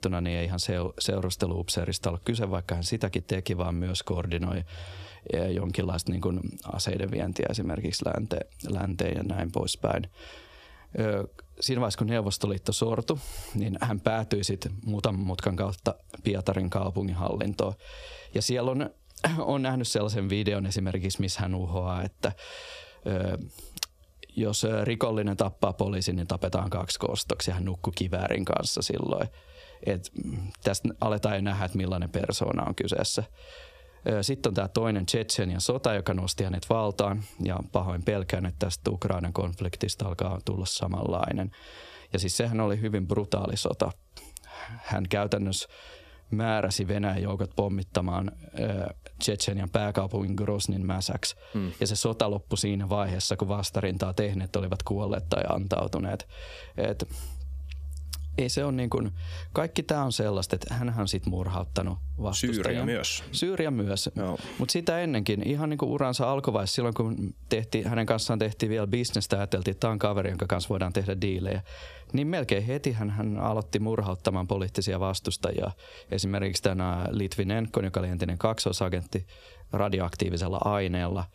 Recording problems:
squashed, flat; heavily

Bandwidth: 14.5 kHz